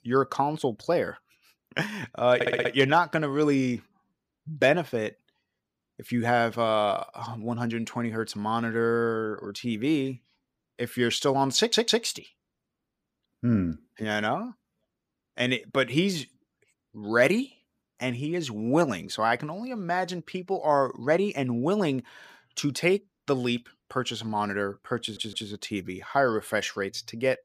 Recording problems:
audio stuttering; at 2.5 s, at 12 s and at 25 s

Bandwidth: 15 kHz